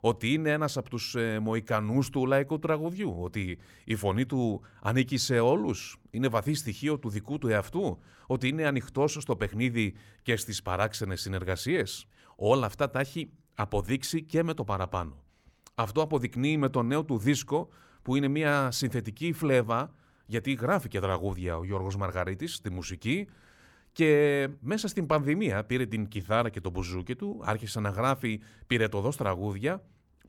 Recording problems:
none

